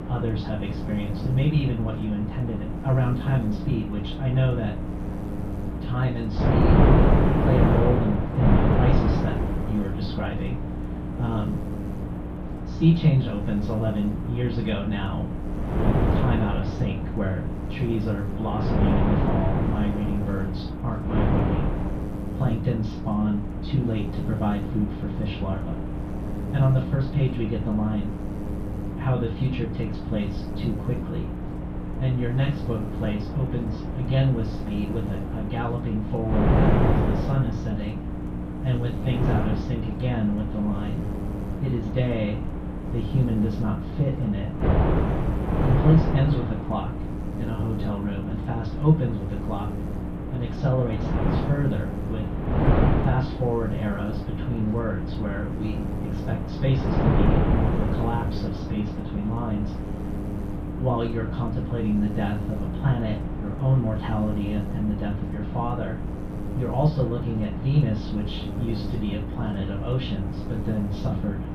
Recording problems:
off-mic speech; far
muffled; very; fading above 3.5 kHz
room echo; slight; dies away in 0.2 s
wind noise on the microphone; heavy; 1 dB below the speech
electrical hum; loud; throughout; 60 Hz, 9 dB below the speech

